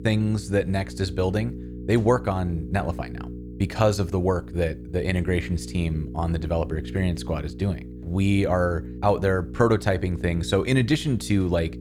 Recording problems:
electrical hum; noticeable; throughout; 60 Hz, 15 dB below the speech

